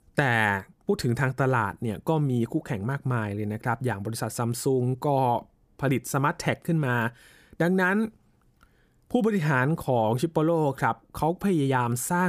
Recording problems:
abrupt cut into speech; at the end

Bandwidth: 15 kHz